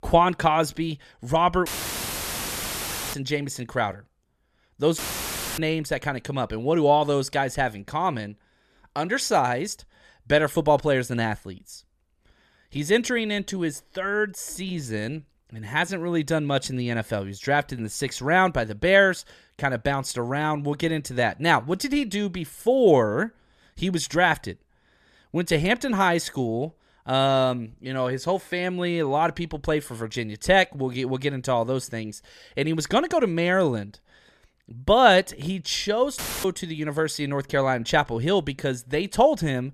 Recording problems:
audio cutting out; filled with static; at 1.5 s for 1.5 s, at 5 s for 0.5 s and at 36 s

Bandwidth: 14 kHz